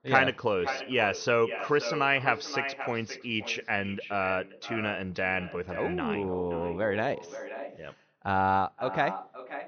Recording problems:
echo of what is said; strong; throughout; 530 ms later, 10 dB below the speech
high frequencies cut off; noticeable; nothing above 6.5 kHz

